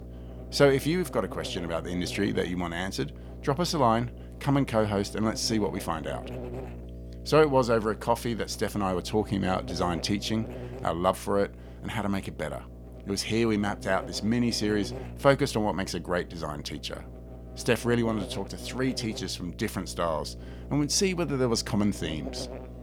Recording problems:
electrical hum; noticeable; throughout; 60 Hz, 15 dB below the speech

